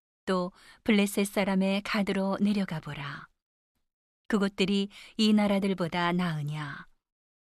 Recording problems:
none

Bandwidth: 13.5 kHz